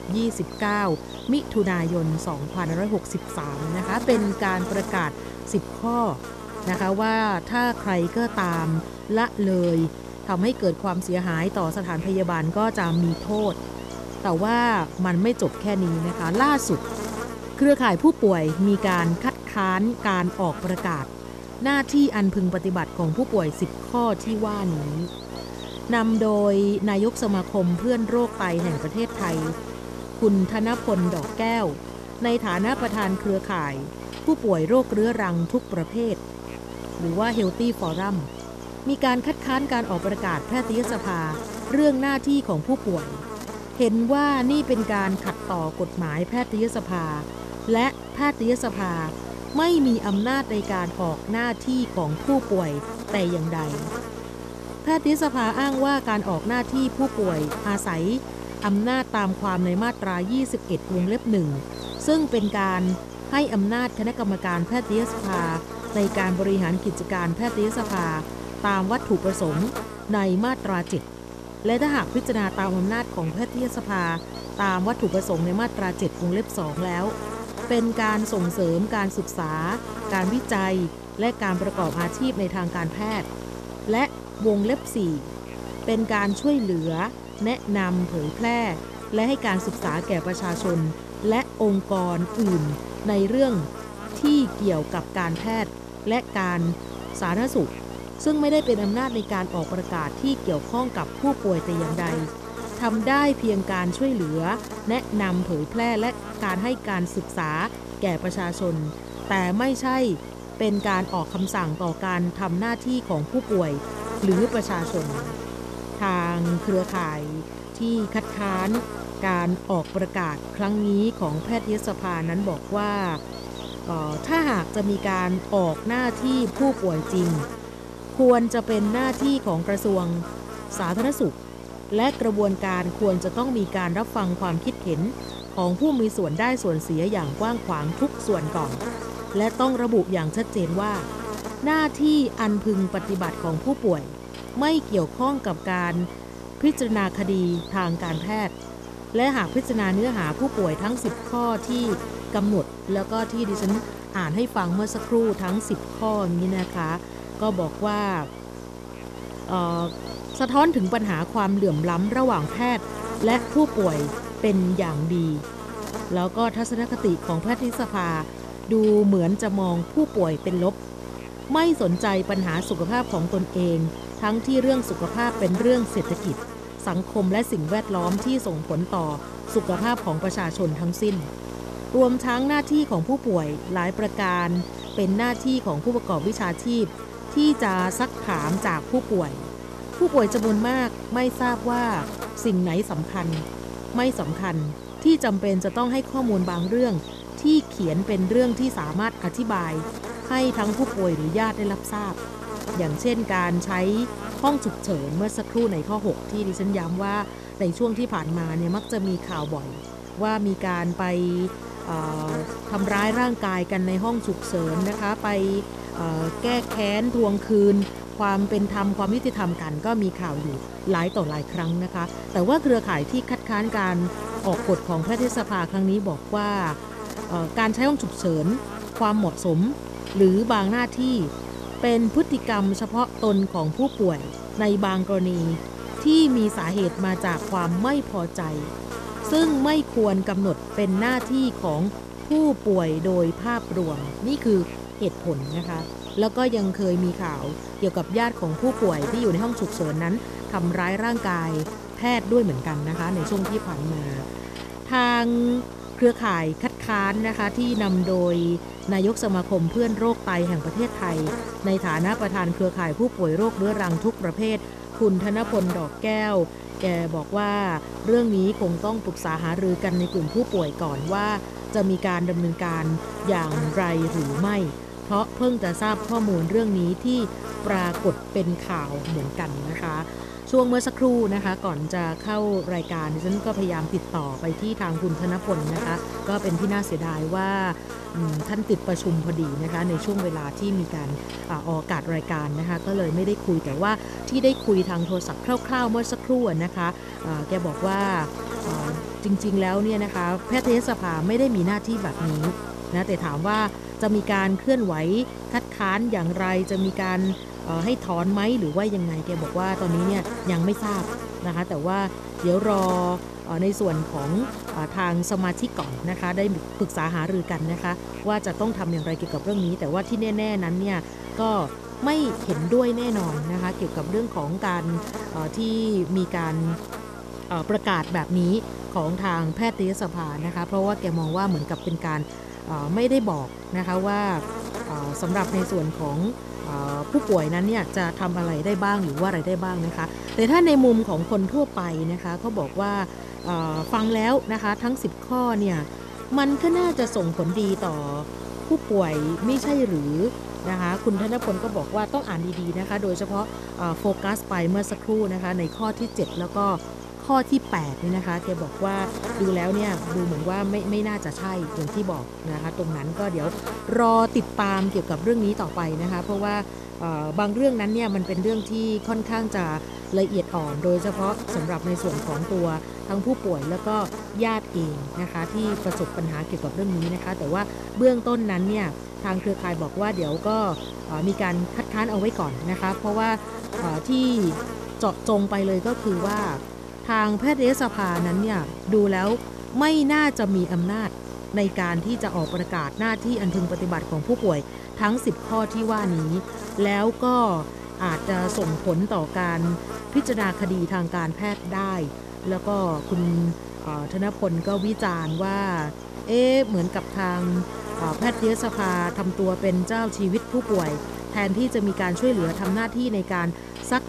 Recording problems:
electrical hum; loud; throughout; 60 Hz, 10 dB below the speech

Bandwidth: 14 kHz